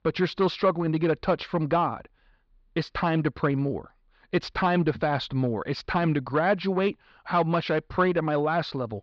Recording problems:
muffled; slightly; fading above 4.5 kHz

